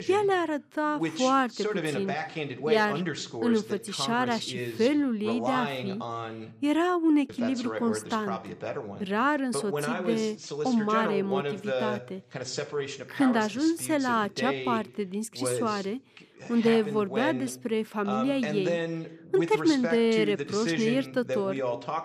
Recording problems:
voice in the background; loud; throughout; 6 dB below the speech

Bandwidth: 14.5 kHz